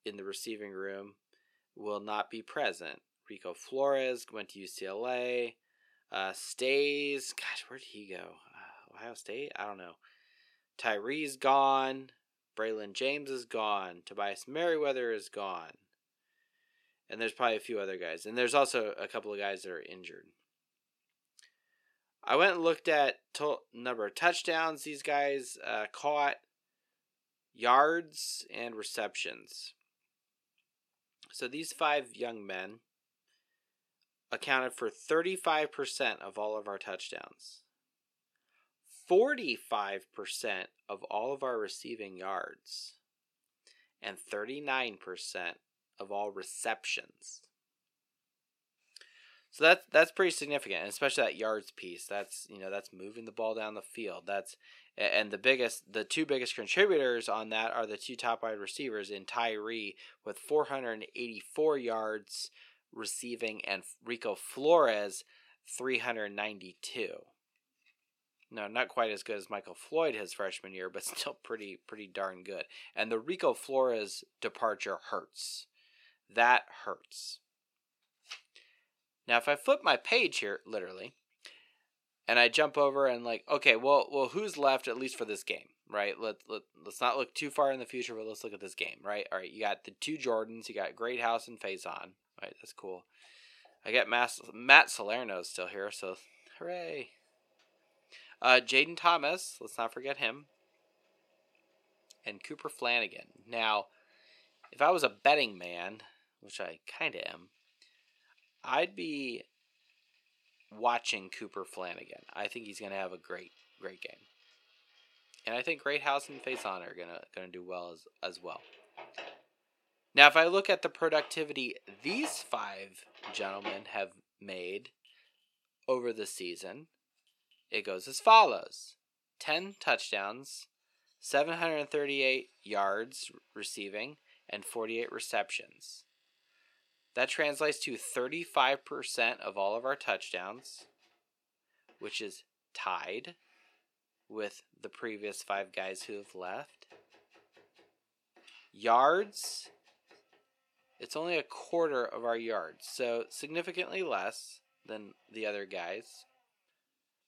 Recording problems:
thin; somewhat; fading below 450 Hz
household noises; faint; from 1:32 on; 20 dB below the speech

